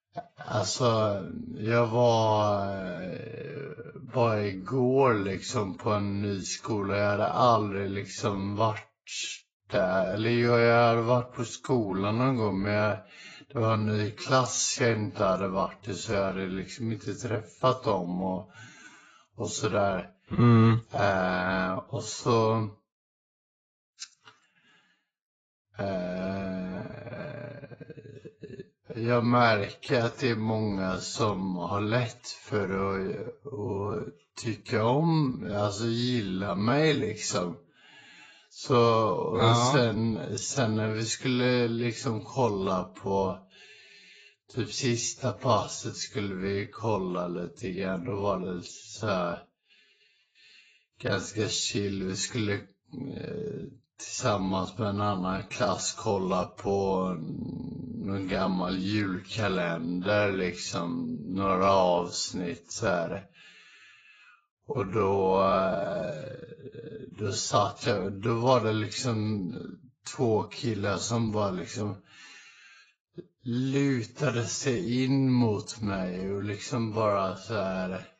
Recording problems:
garbled, watery; badly; nothing above 7.5 kHz
wrong speed, natural pitch; too slow; 0.5 times normal speed

